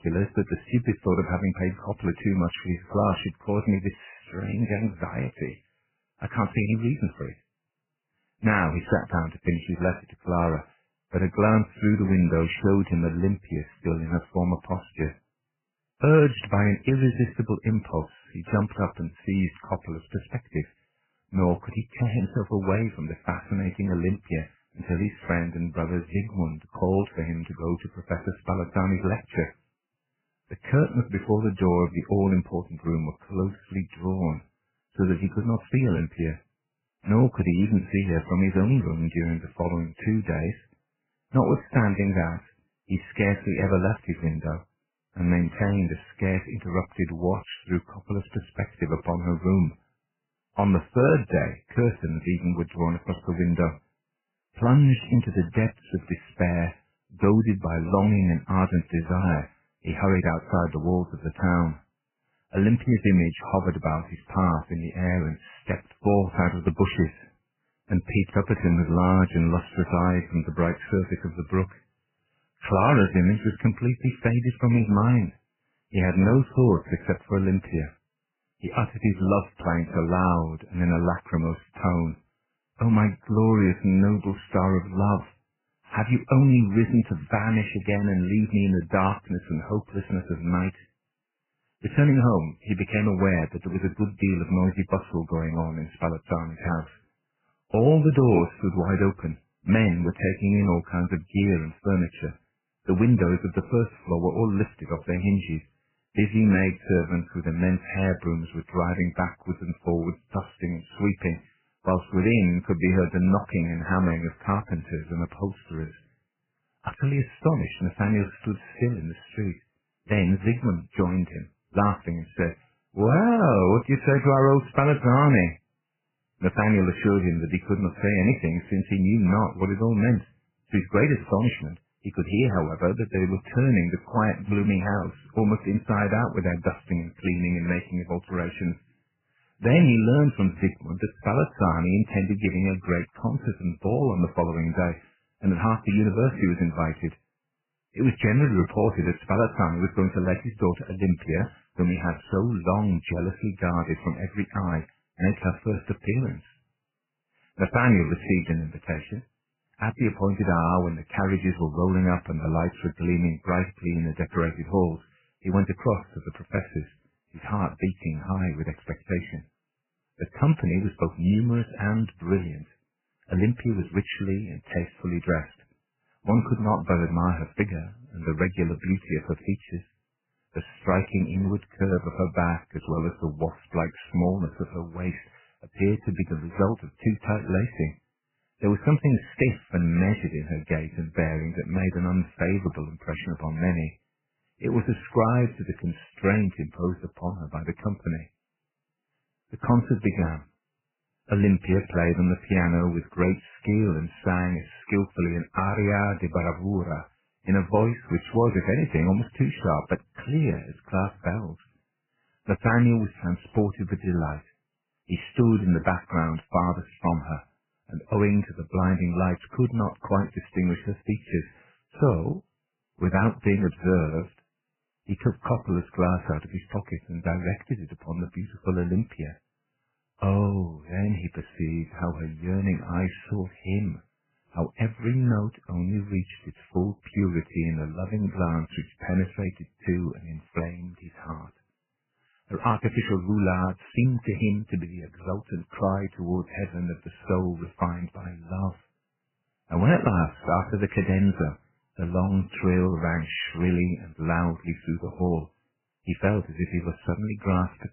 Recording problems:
garbled, watery; badly; nothing above 3 kHz

